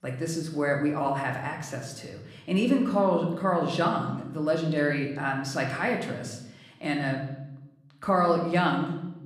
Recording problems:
room echo; slight; dies away in 0.8 s
off-mic speech; somewhat distant

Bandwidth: 14.5 kHz